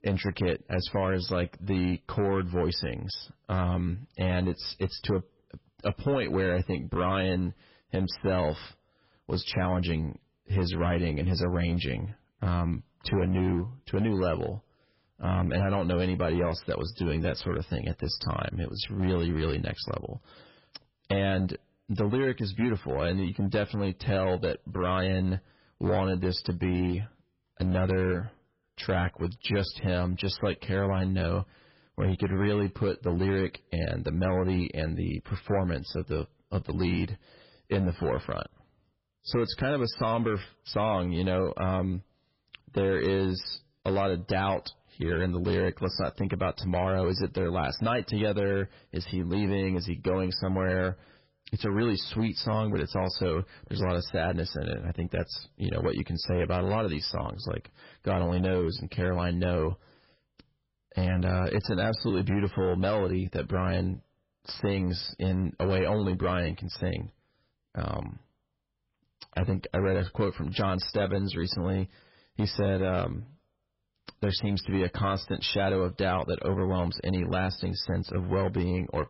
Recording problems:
garbled, watery; badly; nothing above 5.5 kHz
distortion; slight; 7% of the sound clipped

